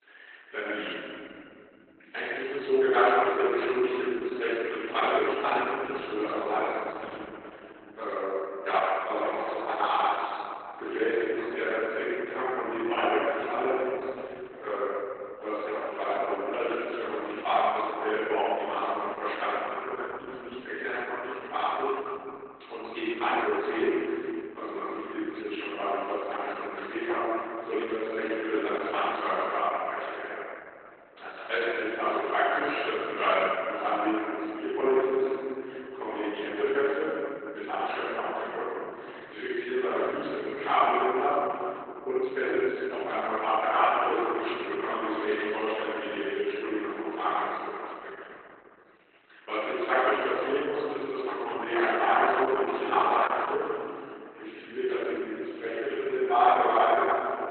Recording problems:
room echo; strong; dies away in 3 s
off-mic speech; far
garbled, watery; badly
thin; somewhat; fading below 300 Hz

